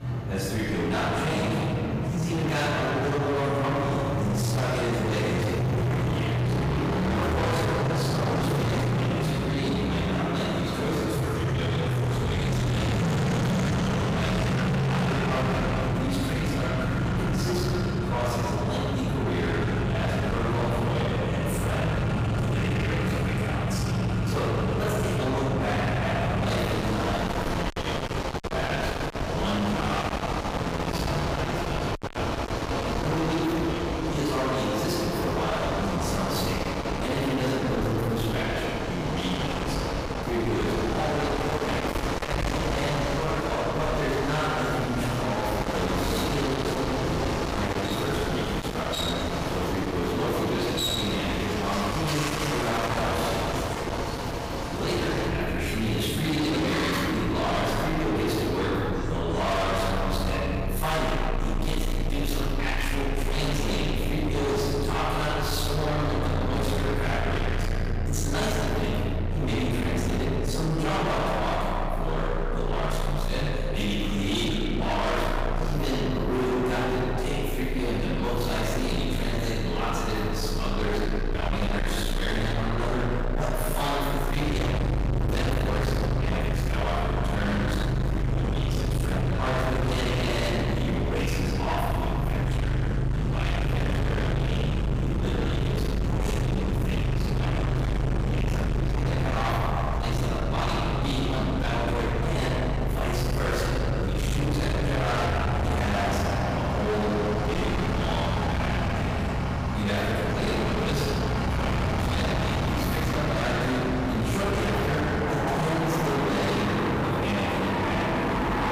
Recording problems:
distortion; heavy; 49% of the sound clipped
room echo; strong; dies away in 2.6 s
off-mic speech; far
traffic noise; loud; throughout; 1 dB below the speech

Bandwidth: 15.5 kHz